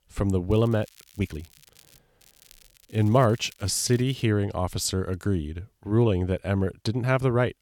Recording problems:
crackling; faint; from 0.5 to 2 s and from 2 to 4 s; 30 dB below the speech
uneven, jittery; slightly; from 1 to 7 s

